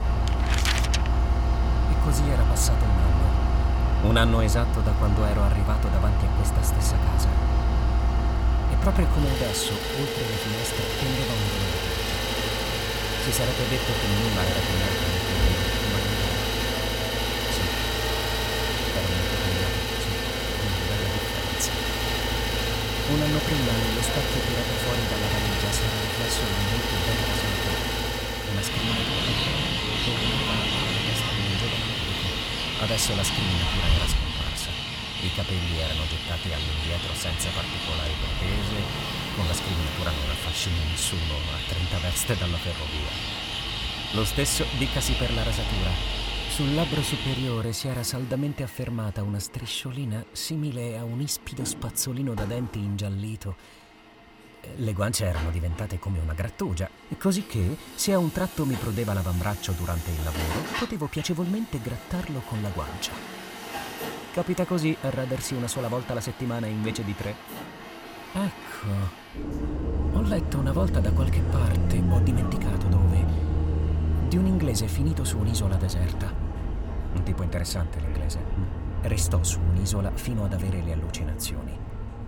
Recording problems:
traffic noise; very loud; throughout; 3 dB above the speech

